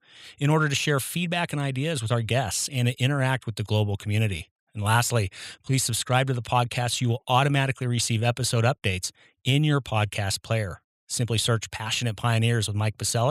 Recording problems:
abrupt cut into speech; at the end

